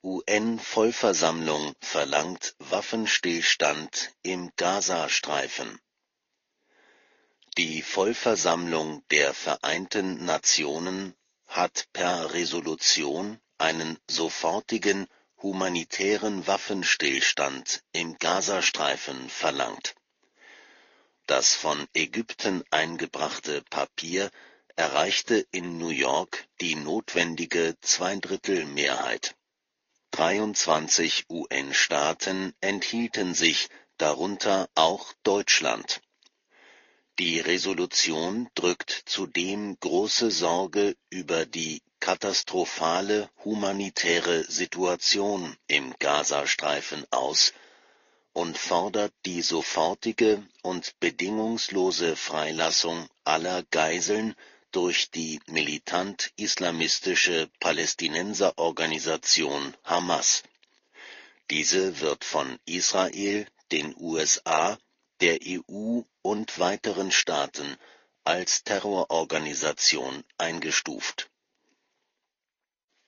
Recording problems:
thin; somewhat; fading below 250 Hz
high frequencies cut off; noticeable; nothing above 6.5 kHz
garbled, watery; slightly

